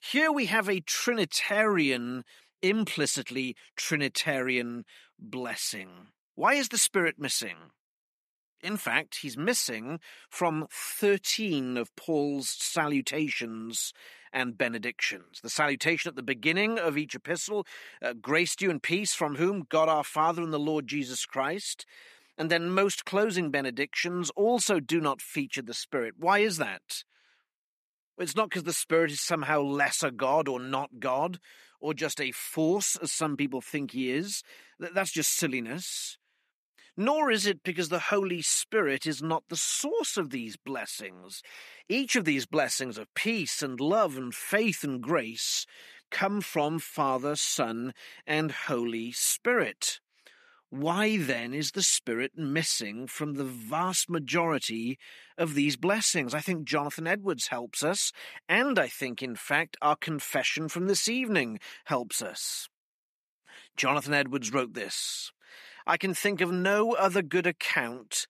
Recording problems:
thin; somewhat; fading below 700 Hz

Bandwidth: 14.5 kHz